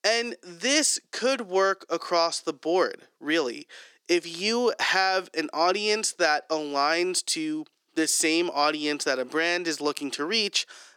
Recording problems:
thin; somewhat; fading below 350 Hz

